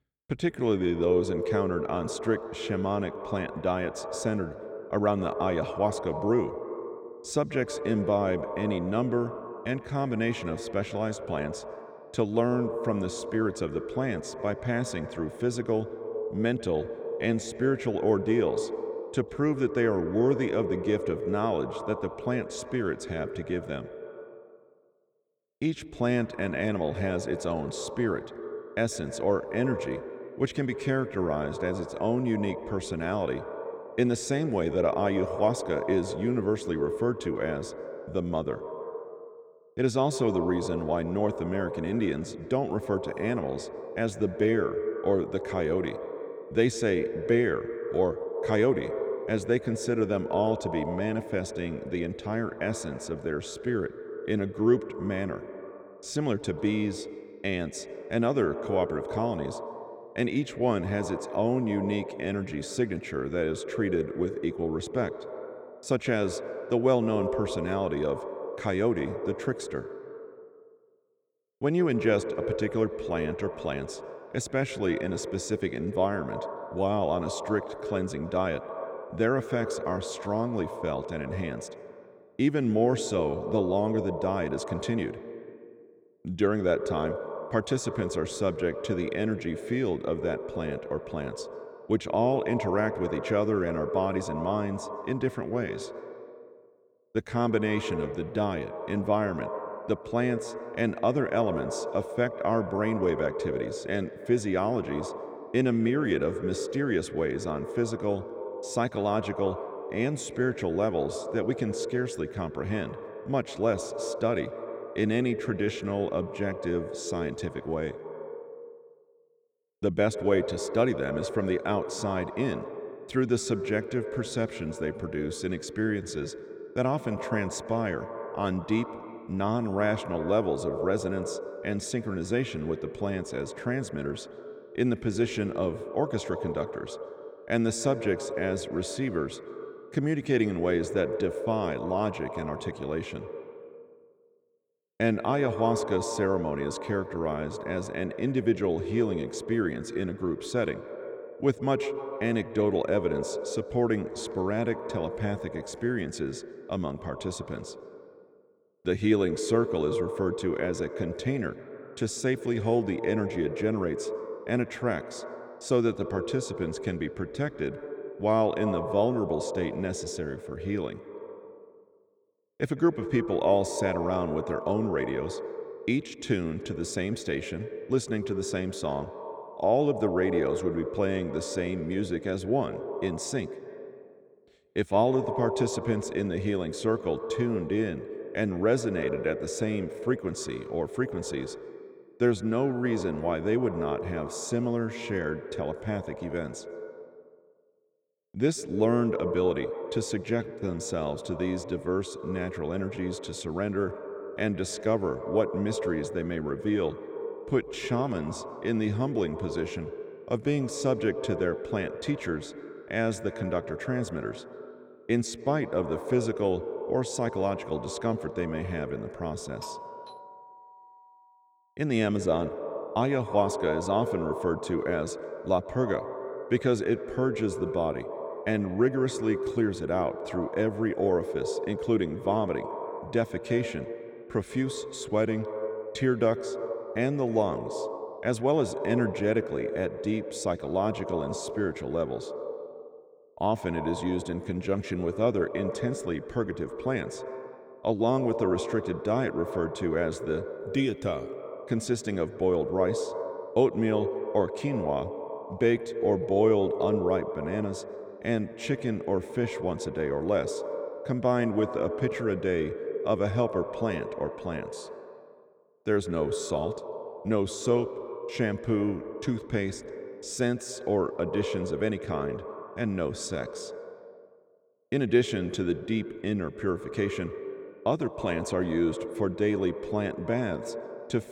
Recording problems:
echo of what is said; strong; throughout; 150 ms later, 7 dB below the speech
doorbell; faint; from 3:40 to 3:41; peak 10 dB below the speech

